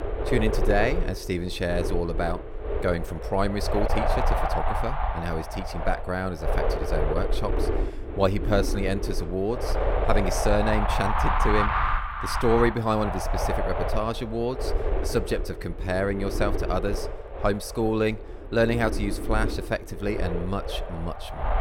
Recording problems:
wind noise on the microphone; heavy; 1 dB below the speech

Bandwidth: 16.5 kHz